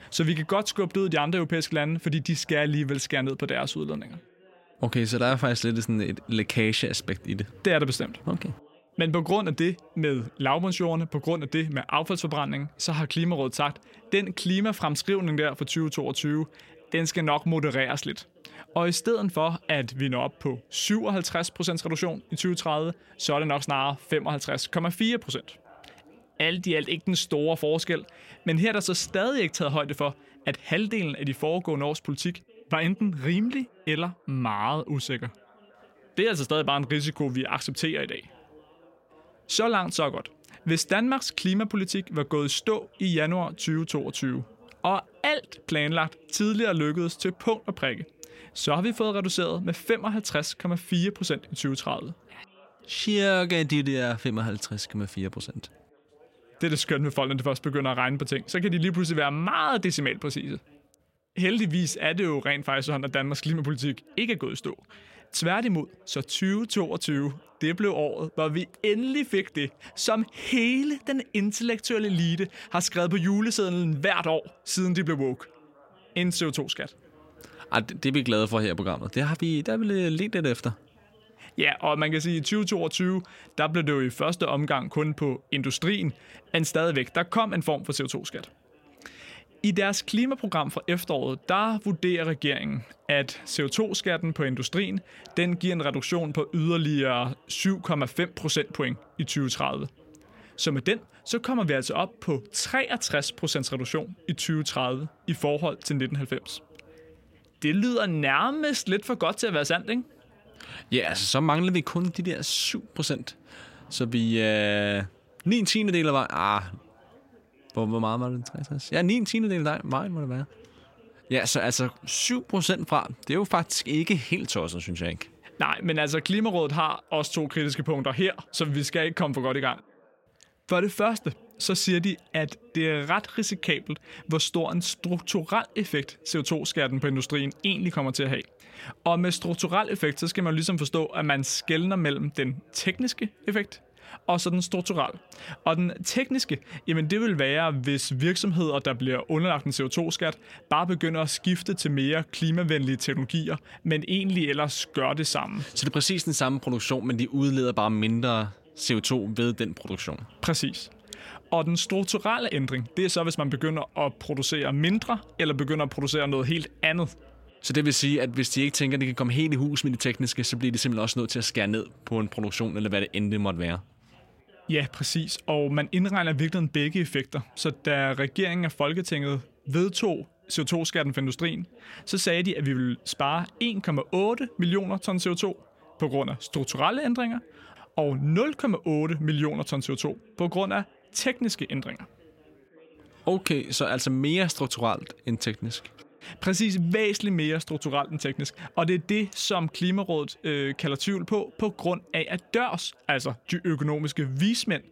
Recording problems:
background chatter; faint; throughout; 2 voices, 30 dB below the speech

